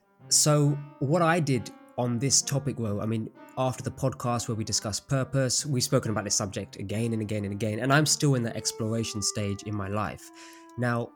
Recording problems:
background music; faint; throughout; 25 dB below the speech

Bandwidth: 18 kHz